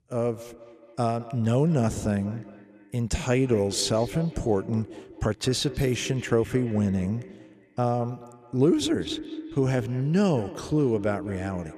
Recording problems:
echo of what is said; noticeable; throughout; 210 ms later, 15 dB below the speech

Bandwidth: 14.5 kHz